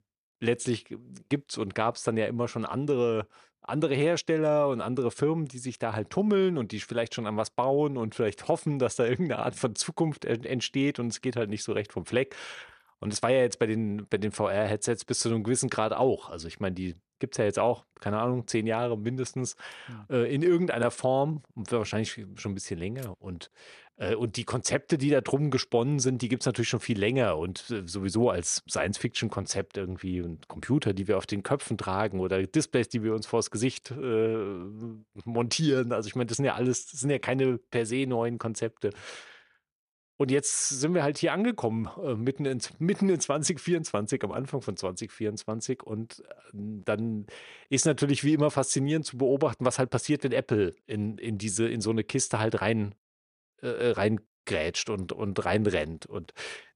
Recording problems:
none

